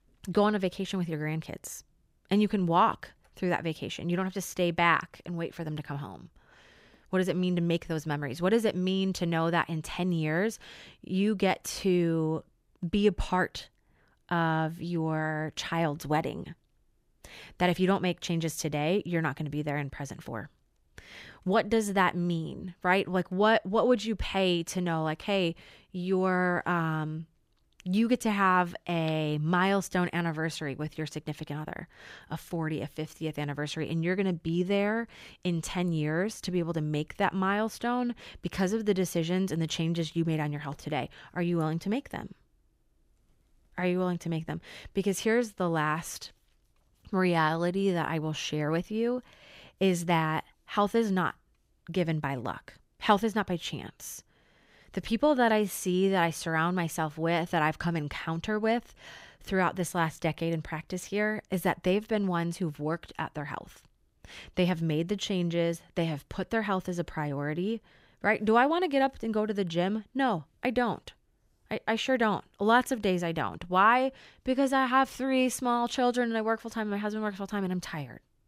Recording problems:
none

